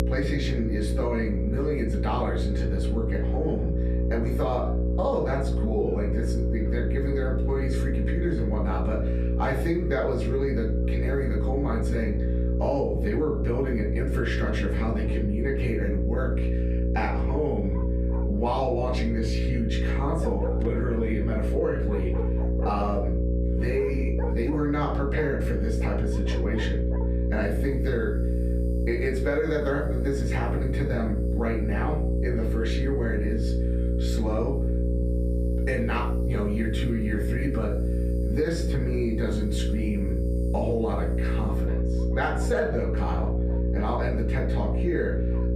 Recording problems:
off-mic speech; far
muffled; slightly; fading above 3 kHz
room echo; slight; dies away in 0.3 s
squashed, flat; somewhat
electrical hum; loud; throughout; 60 Hz, 6 dB below the speech
animal sounds; noticeable; throughout; 15 dB below the speech

